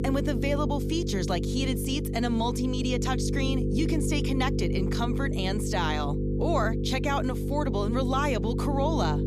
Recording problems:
electrical hum; loud; throughout; 50 Hz, 5 dB below the speech

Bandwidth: 14.5 kHz